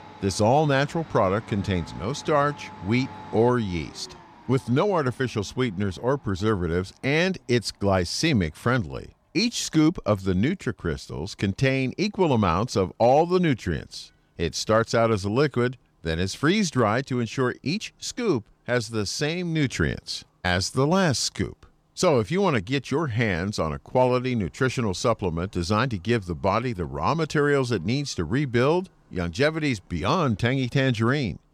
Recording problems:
household noises; faint; throughout; 25 dB below the speech

